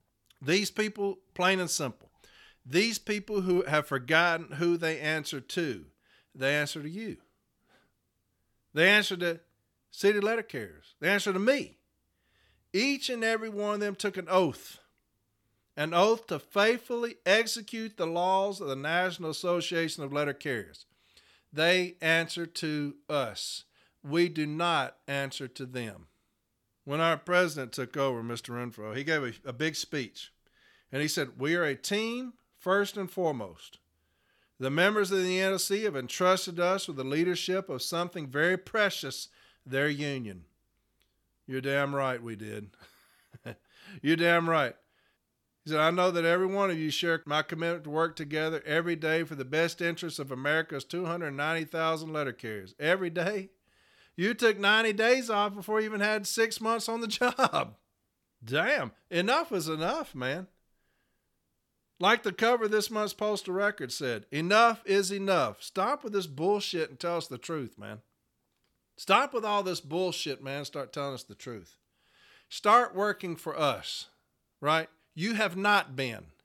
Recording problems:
none

